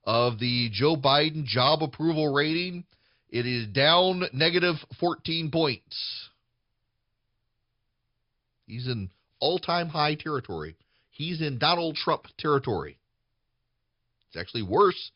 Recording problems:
high frequencies cut off; noticeable; nothing above 5.5 kHz

